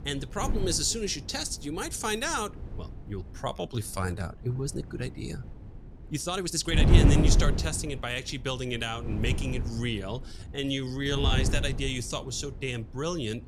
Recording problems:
wind noise on the microphone; heavy; 6 dB below the speech
uneven, jittery; strongly; from 3.5 to 11 s

